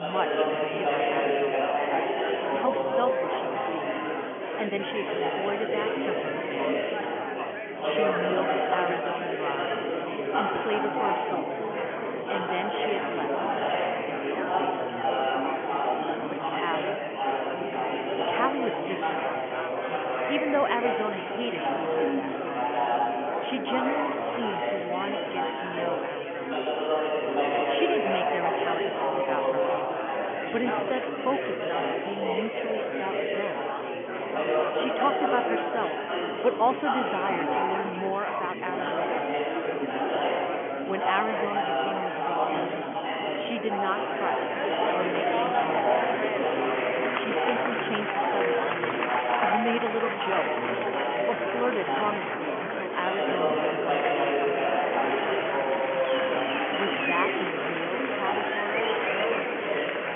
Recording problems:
phone-call audio; nothing above 3.5 kHz
murmuring crowd; very loud; throughout; 6 dB above the speech
abrupt cut into speech; at the start

